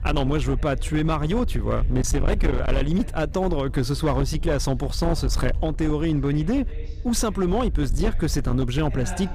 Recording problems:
distortion; slight; 13% of the sound clipped
low rumble; noticeable; throughout; 15 dB below the speech
background chatter; faint; throughout; 3 voices, 20 dB below the speech

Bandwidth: 14.5 kHz